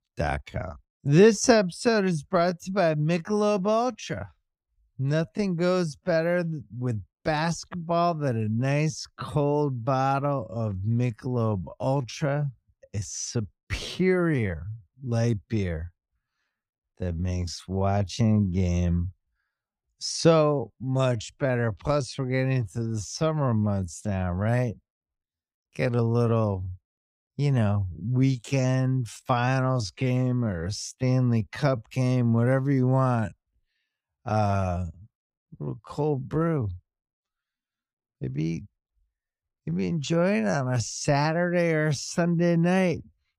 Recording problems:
wrong speed, natural pitch; too slow; 0.6 times normal speed

